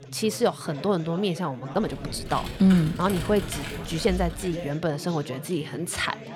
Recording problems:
chatter from many people; noticeable; throughout; 15 dB below the speech
uneven, jittery; strongly; from 1 to 5.5 s
keyboard typing; noticeable; from 2 to 4.5 s; peak 7 dB below the speech

